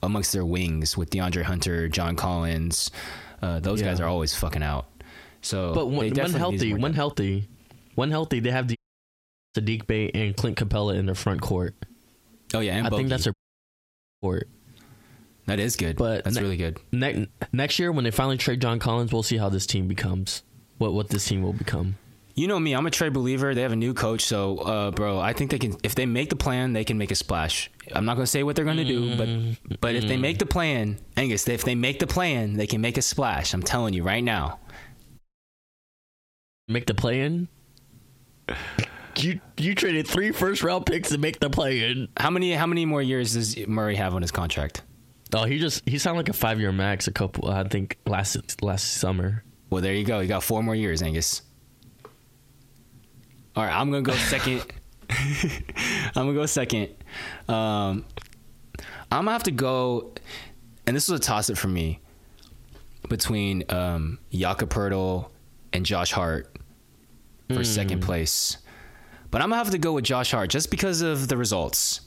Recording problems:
squashed, flat; heavily
audio cutting out; at 9 s for 1 s, at 13 s for 1 s and at 35 s for 1.5 s

